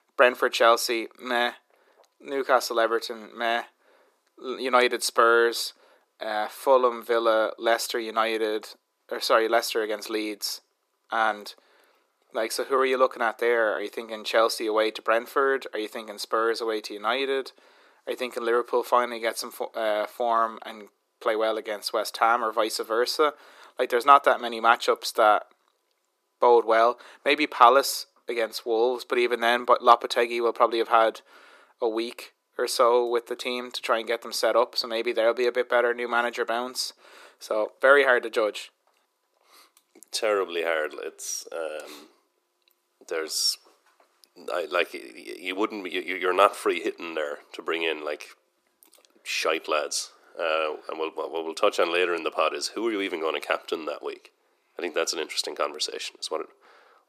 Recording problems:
thin; very; fading below 350 Hz

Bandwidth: 14.5 kHz